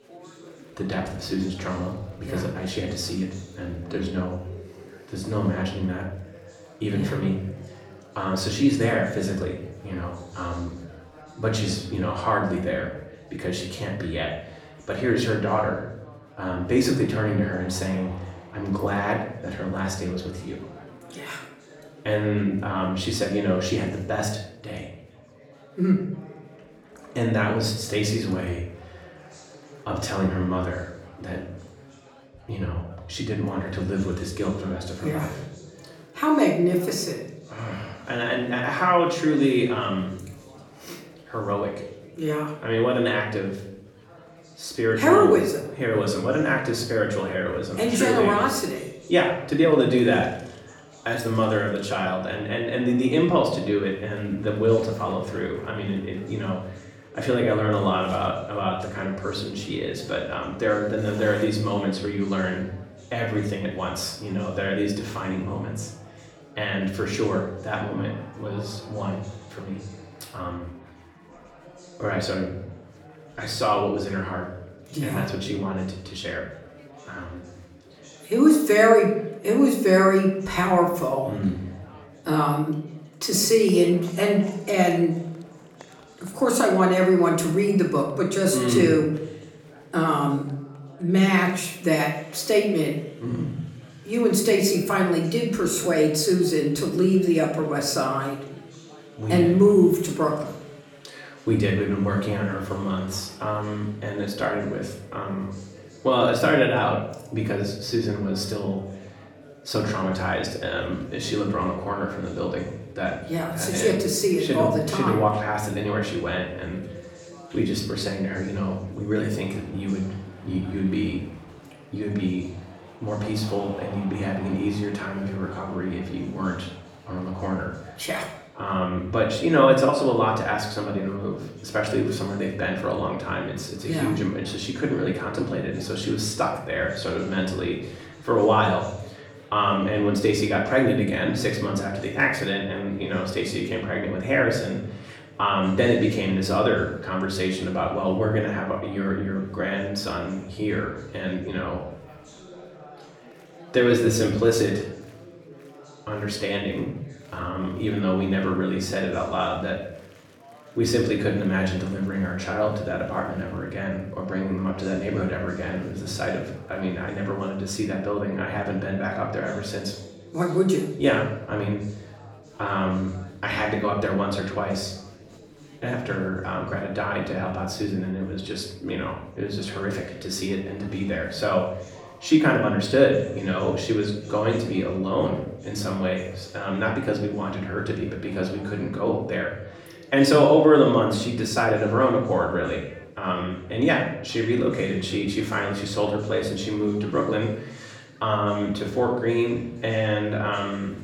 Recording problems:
off-mic speech; far
room echo; slight; dies away in 0.6 s
chatter from many people; faint; throughout; 25 dB below the speech

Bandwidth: 17.5 kHz